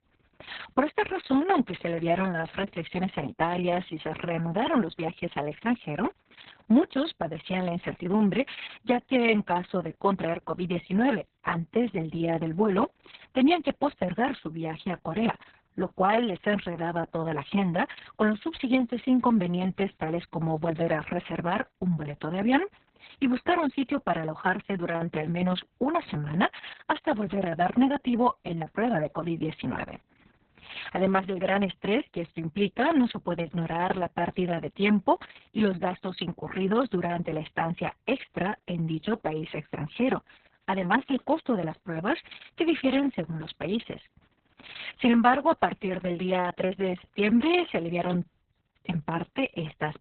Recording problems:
garbled, watery; badly; nothing above 4 kHz

